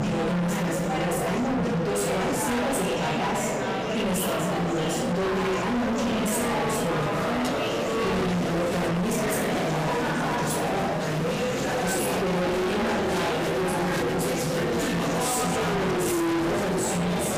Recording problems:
distortion; heavy; 50% of the sound clipped
off-mic speech; far
room echo; noticeable; dies away in 0.8 s
background music; loud; throughout; 3 dB below the speech
murmuring crowd; loud; throughout; as loud as the speech
clattering dishes; faint; at 7.5 s; peak 10 dB below the speech

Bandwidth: 15 kHz